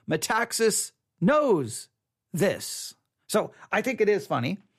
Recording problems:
none

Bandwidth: 15 kHz